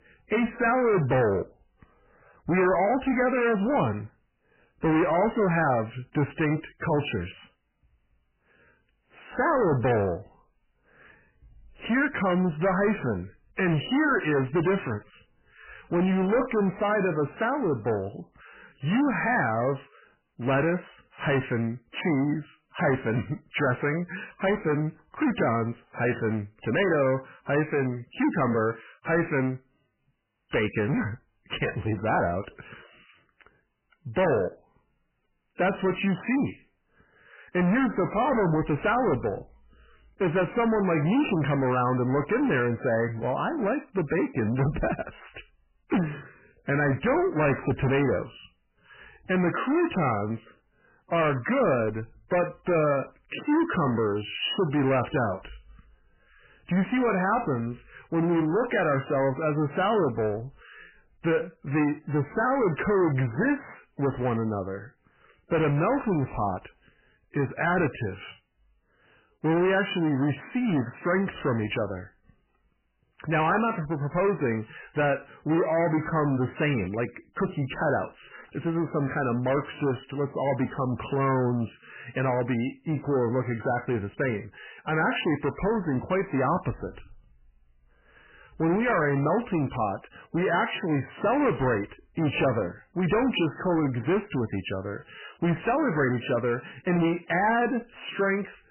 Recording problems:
distortion; heavy; 6 dB below the speech
garbled, watery; badly; nothing above 3 kHz

